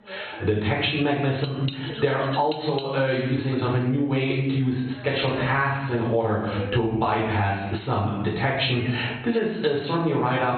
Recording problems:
off-mic speech; far
garbled, watery; badly; nothing above 4 kHz
room echo; noticeable; dies away in 0.7 s
squashed, flat; somewhat
voice in the background; noticeable; throughout; 15 dB below the speech
clattering dishes; very faint; from 1.5 to 3 s; peak 10 dB below the speech

